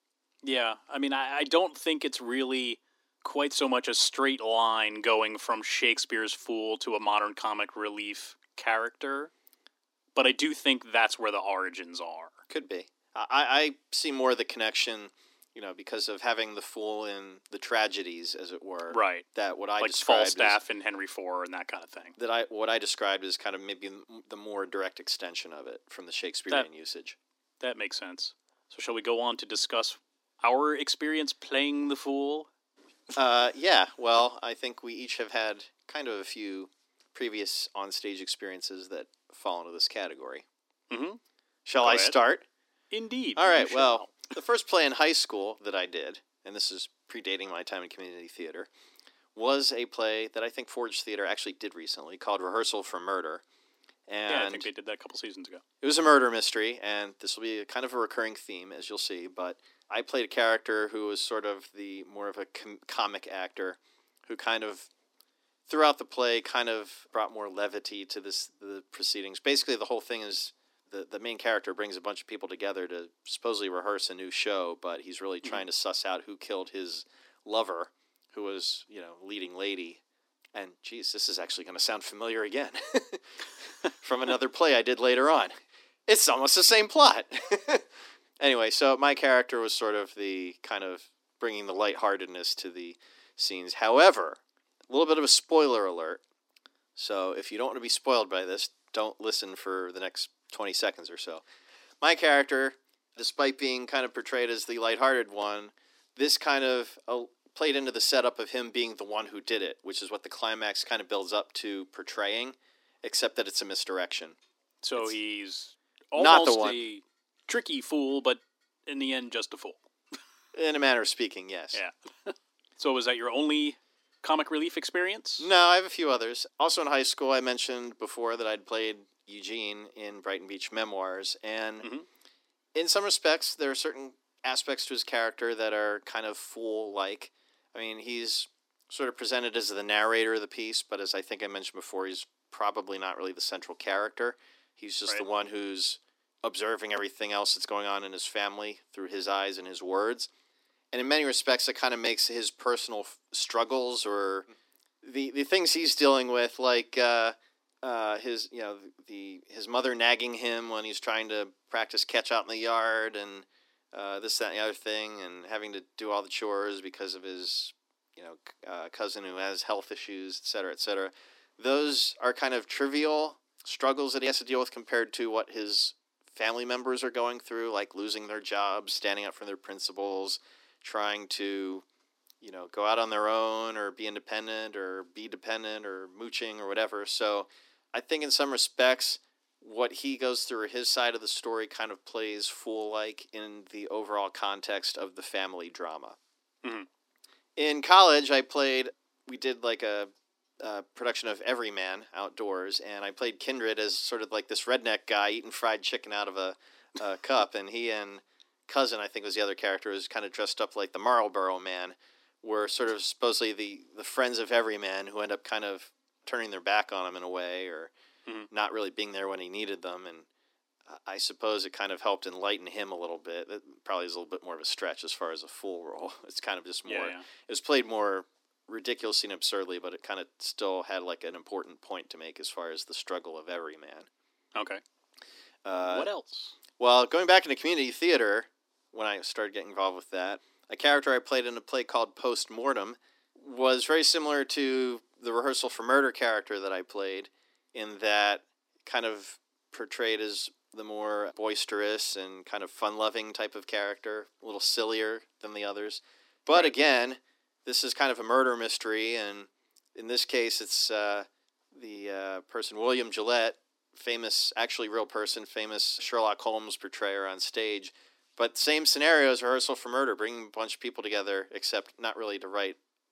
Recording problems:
thin; somewhat; fading below 250 Hz

